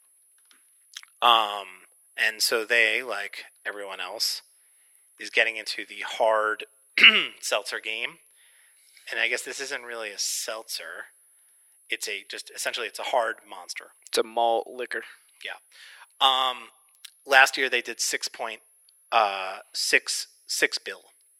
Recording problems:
thin; very; fading below 400 Hz
high-pitched whine; faint; throughout; 10.5 kHz, 35 dB below the speech

